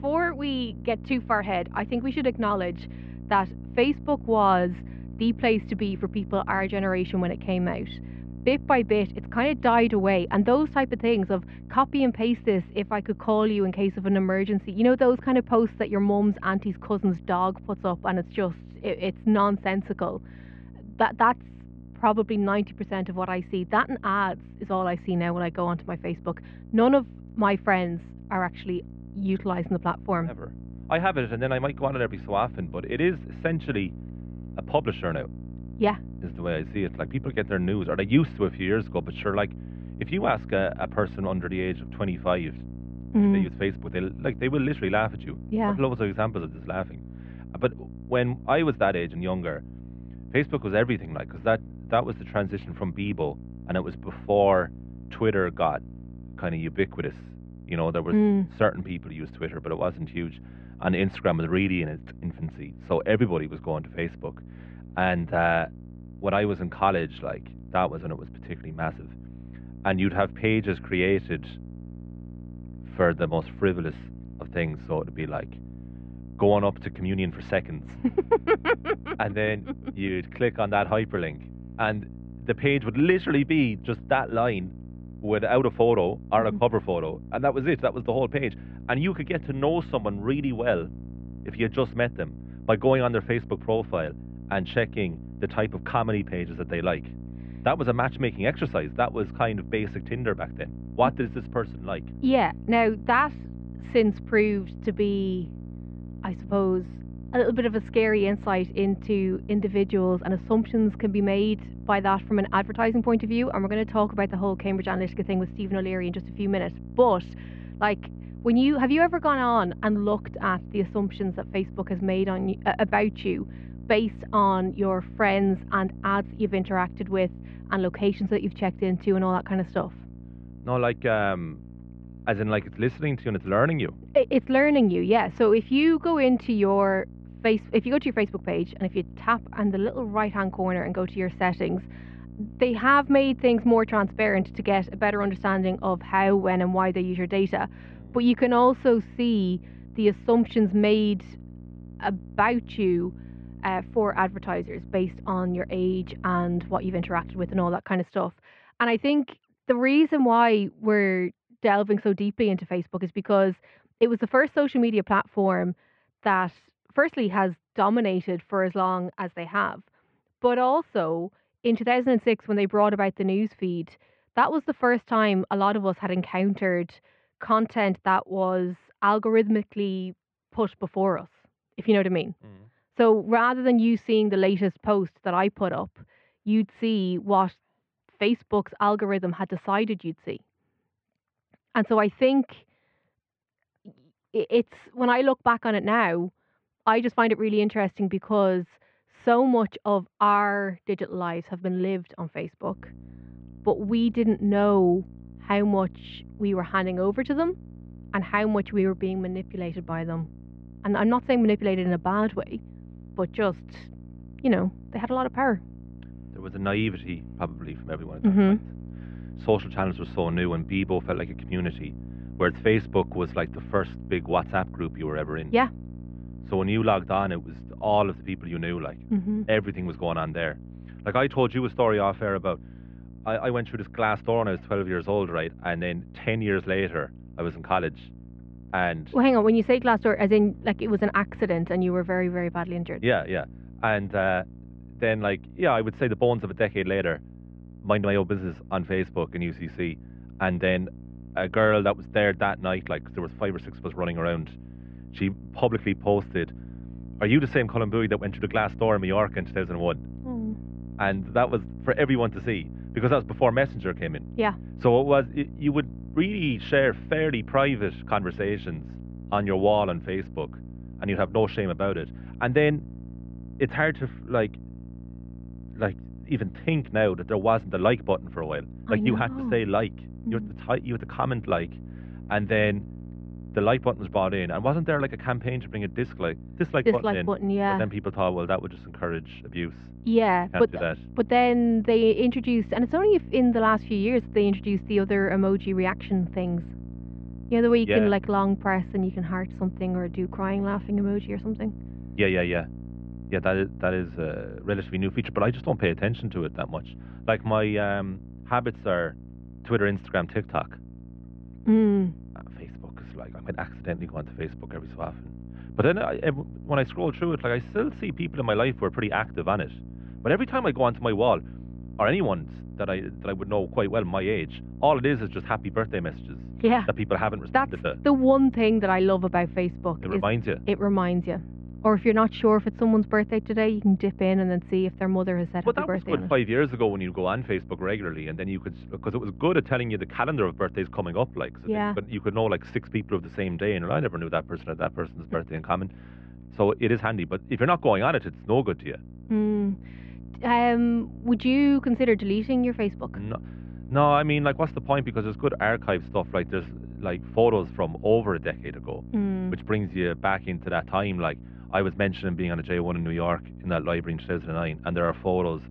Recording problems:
muffled; very; fading above 3 kHz
electrical hum; faint; until 2:38 and from 3:23 on; 60 Hz, 25 dB below the speech

